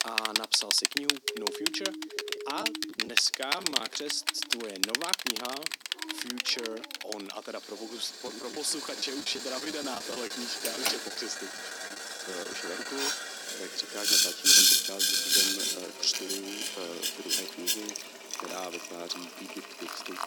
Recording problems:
thin; somewhat; fading below 250 Hz
household noises; very loud; throughout; 7 dB above the speech
siren; noticeable; from 1 to 3 s; peak 5 dB below the speech
choppy; very; from 2.5 to 4 s and from 8.5 to 13 s; 9% of the speech affected
dog barking; faint; from 3.5 to 8 s; peak 10 dB below the speech

